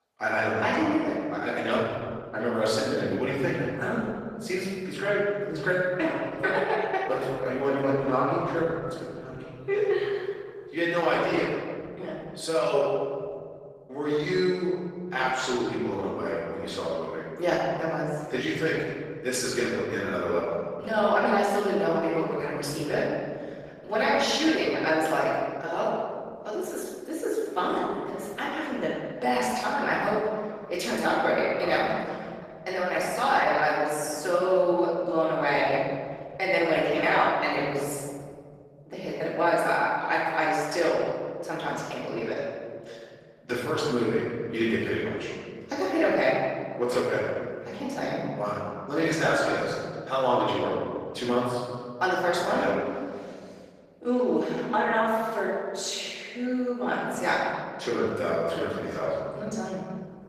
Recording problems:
room echo; strong; dies away in 2.2 s
off-mic speech; far
garbled, watery; slightly; nothing above 14.5 kHz
thin; very slightly; fading below 450 Hz

